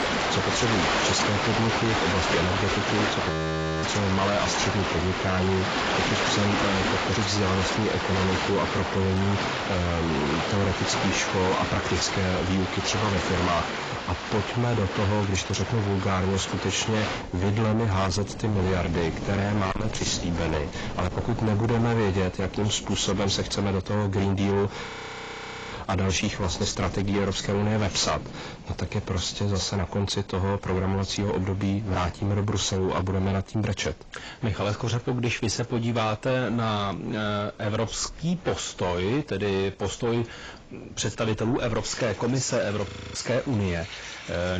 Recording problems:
distortion; heavy; 6 dB below the speech
garbled, watery; badly; nothing above 7.5 kHz
rain or running water; loud; throughout; 2 dB below the speech
audio freezing; at 3.5 s for 0.5 s, at 25 s for 1 s and at 43 s
abrupt cut into speech; at the end

